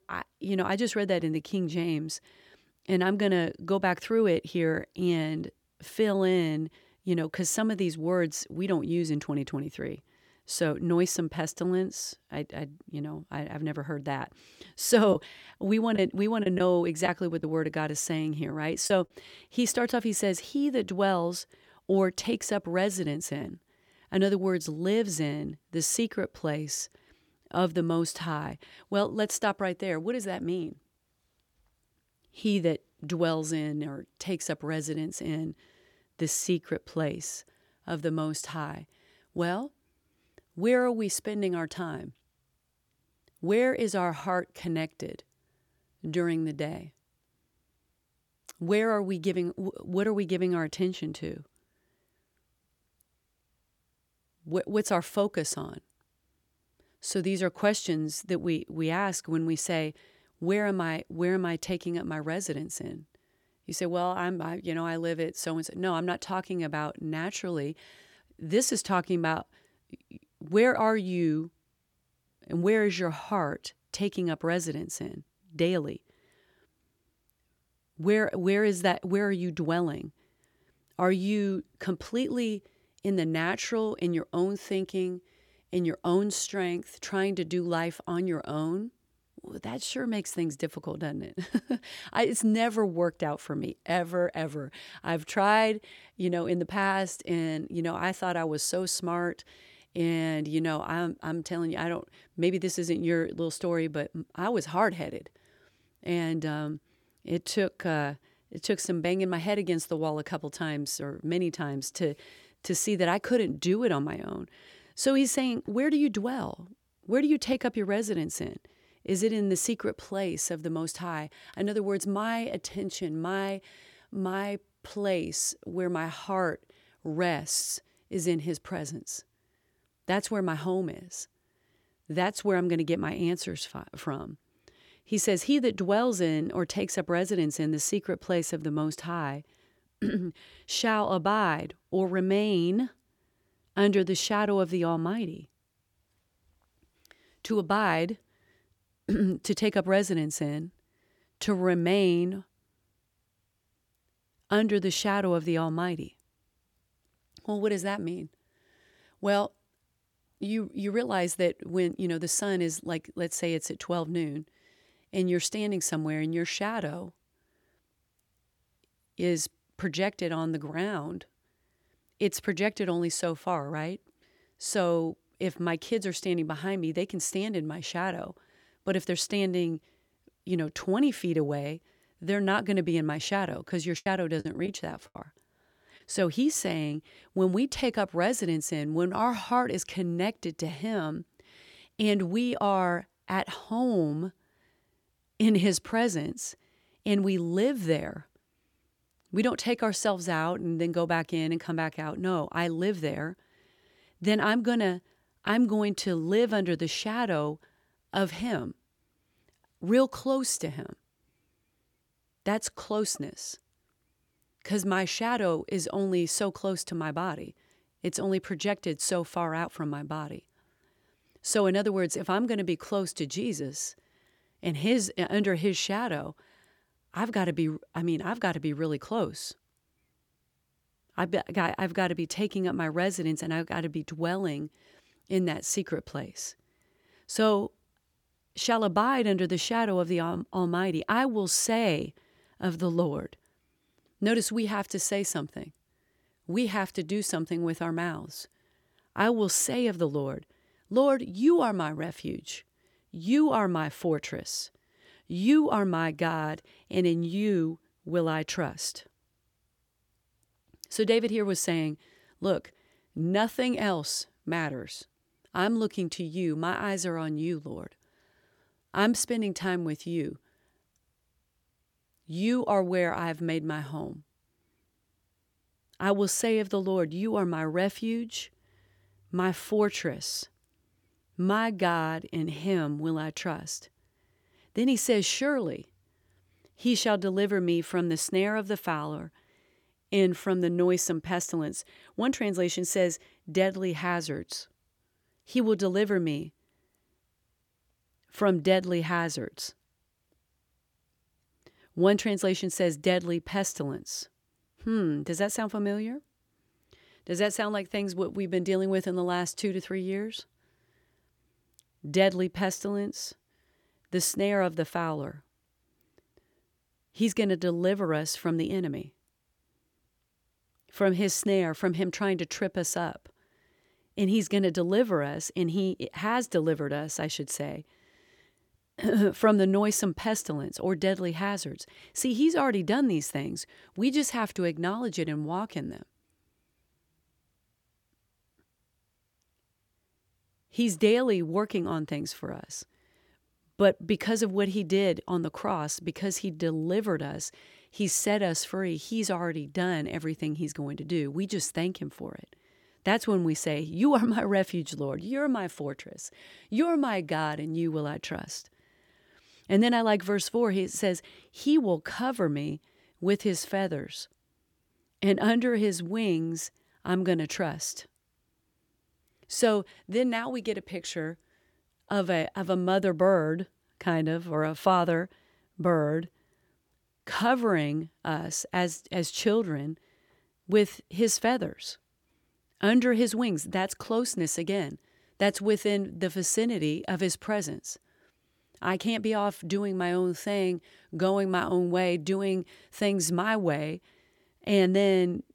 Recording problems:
choppy; very; from 3:04 to 3:05; 7% of the speech affected

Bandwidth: 18.5 kHz